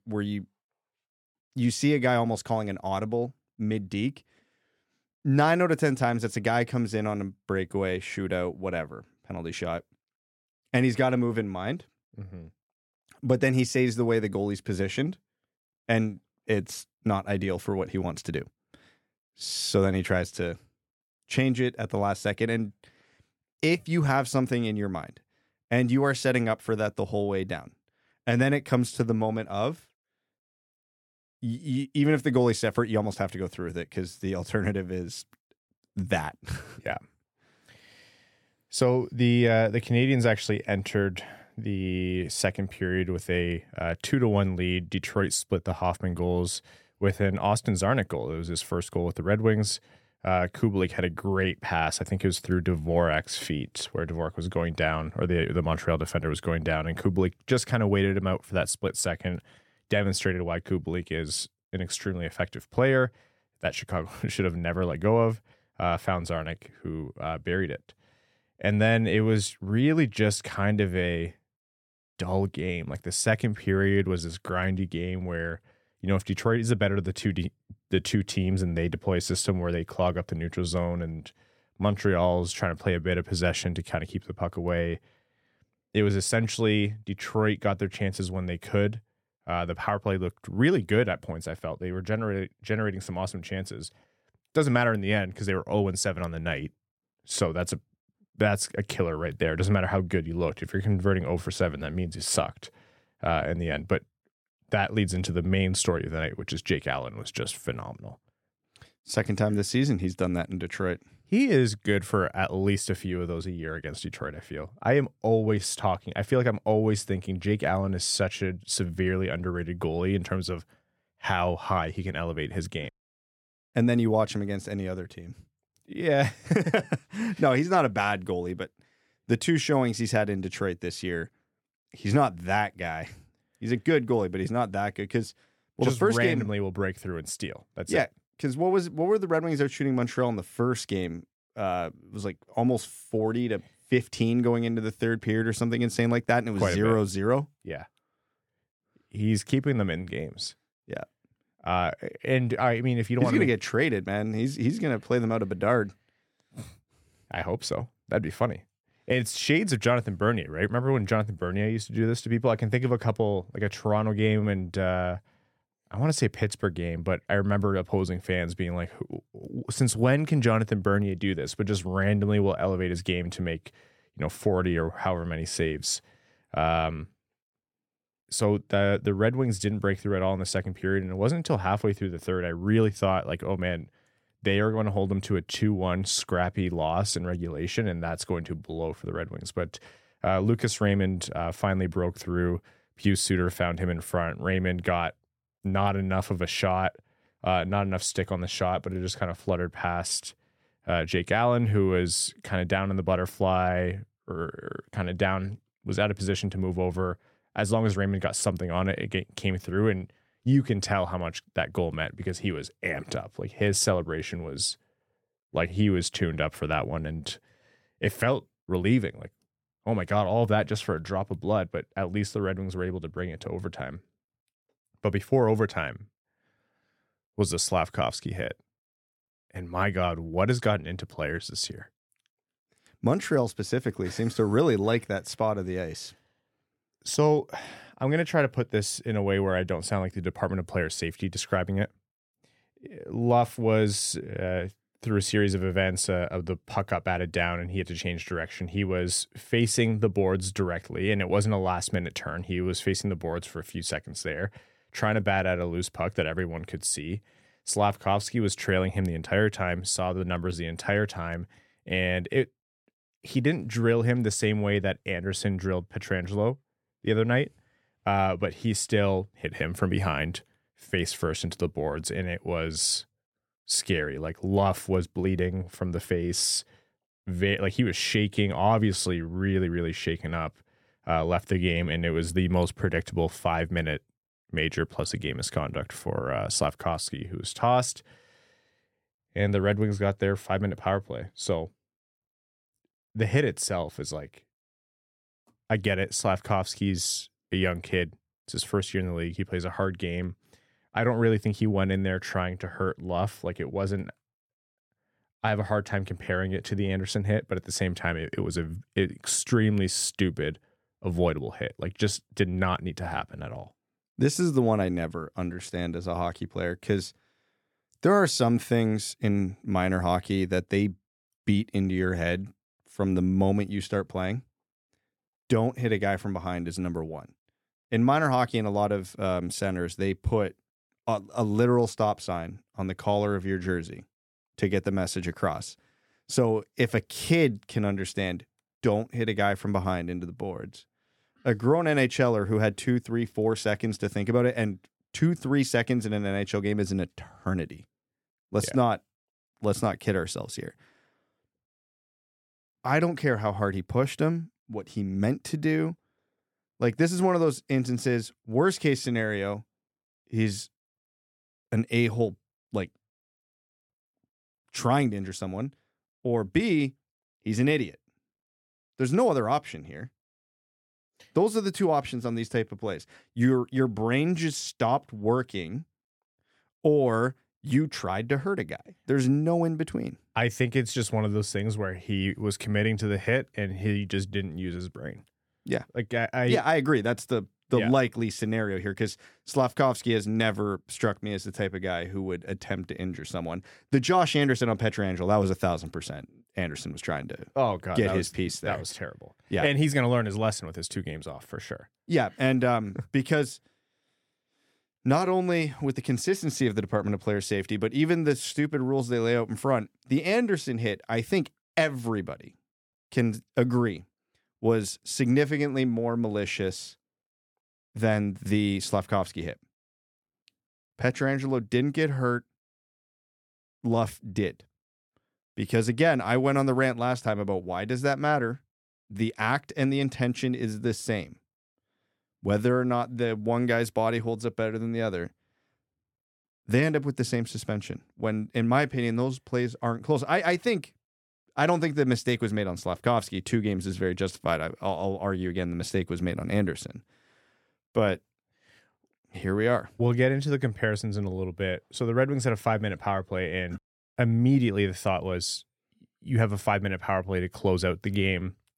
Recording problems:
none

